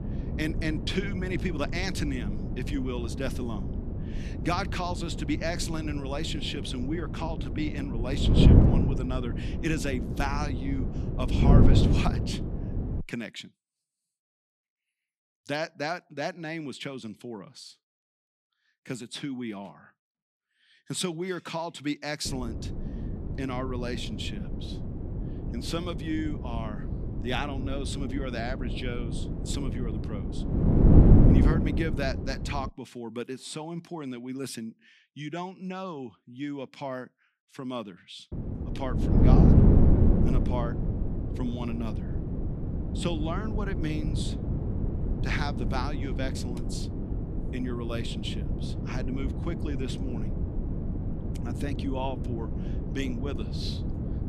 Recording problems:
wind noise on the microphone; heavy; until 13 s, from 22 to 33 s and from 38 s on; 2 dB below the speech

